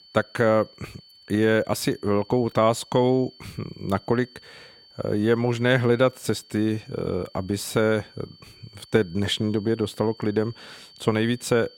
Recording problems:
high-pitched whine; faint; throughout; 4.5 kHz, 25 dB below the speech

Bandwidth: 16.5 kHz